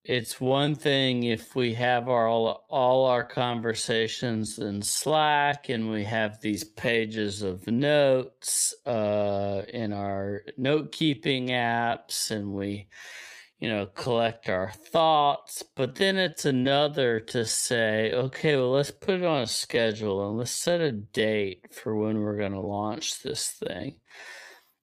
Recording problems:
wrong speed, natural pitch; too slow; 0.5 times normal speed

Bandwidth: 15 kHz